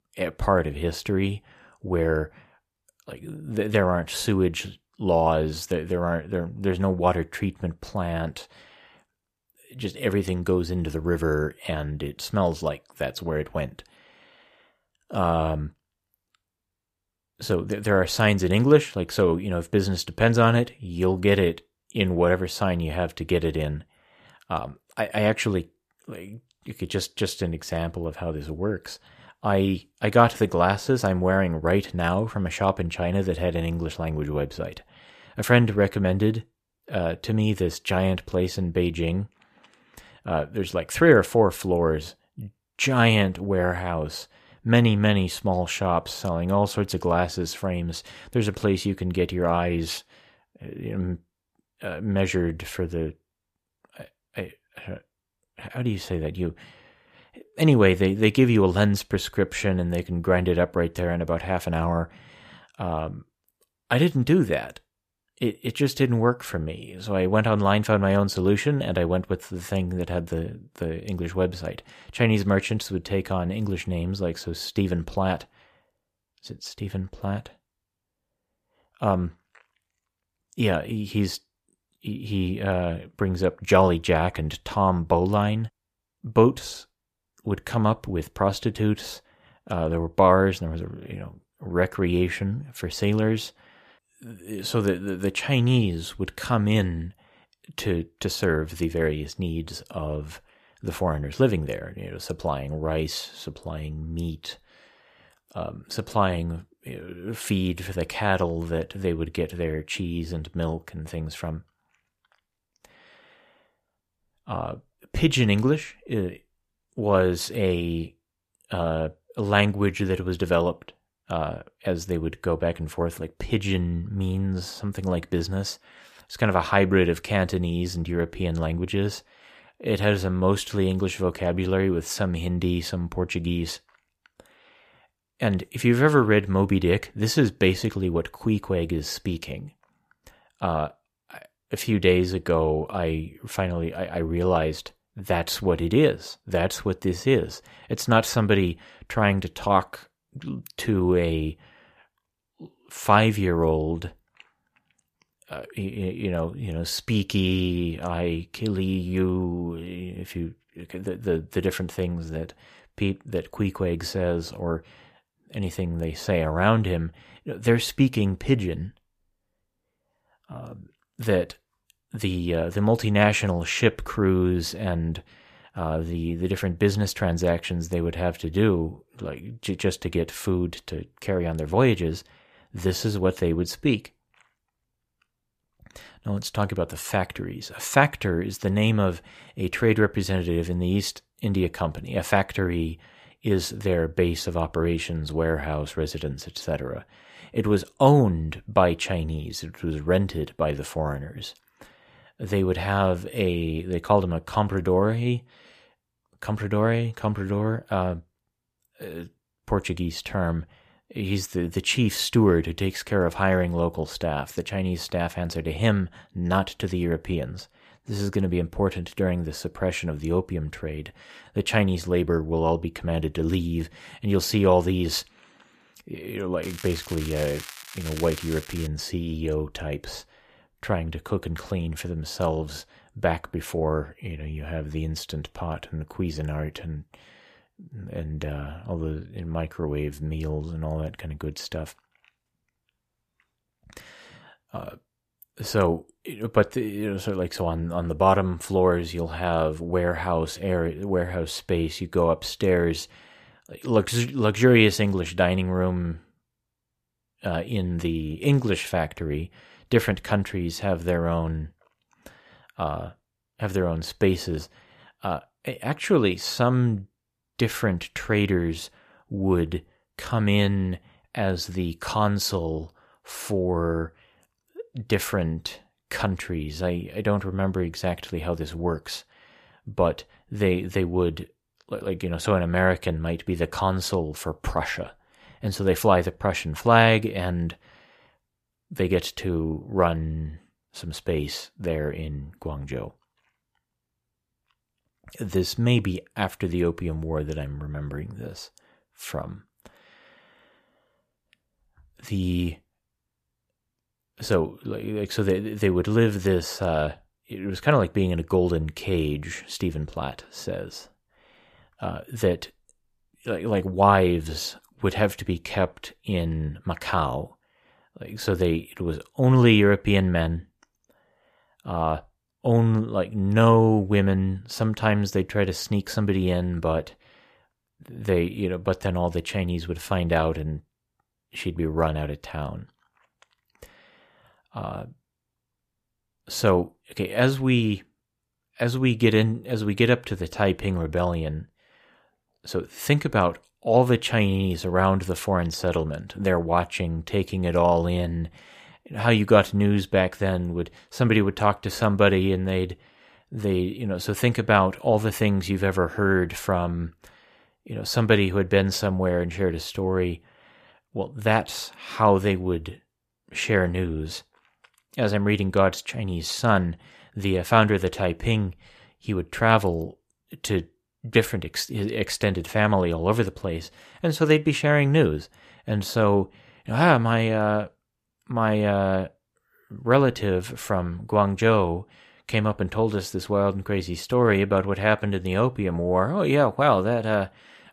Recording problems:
crackling; noticeable; from 3:47 to 3:49; 15 dB below the speech

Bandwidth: 14.5 kHz